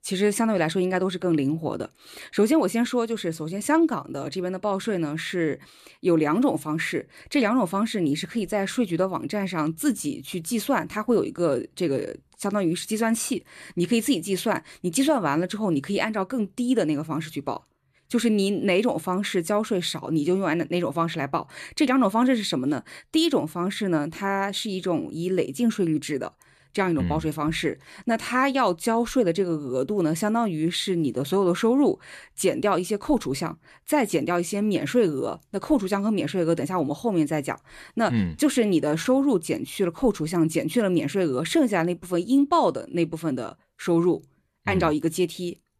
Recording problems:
none

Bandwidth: 14 kHz